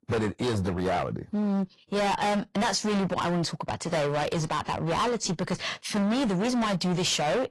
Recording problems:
distortion; heavy; 27% of the sound clipped
garbled, watery; slightly; nothing above 11.5 kHz

